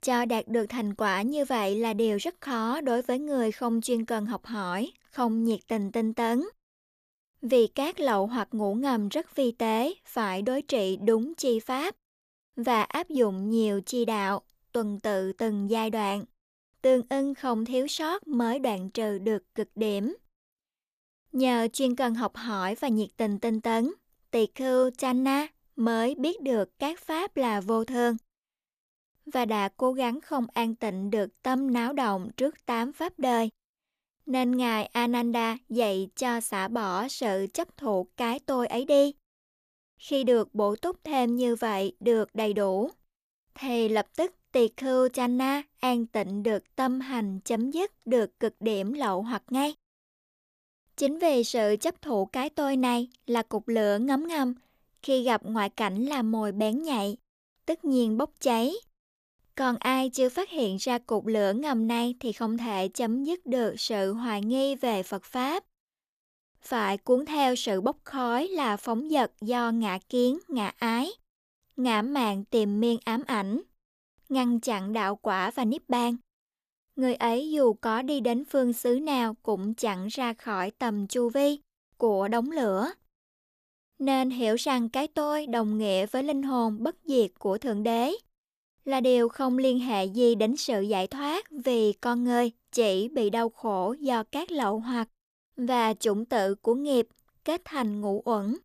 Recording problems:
none

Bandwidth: 14.5 kHz